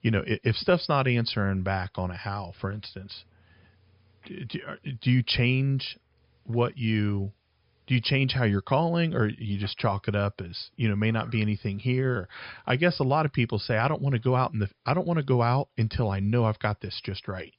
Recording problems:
high frequencies cut off; noticeable; nothing above 5 kHz

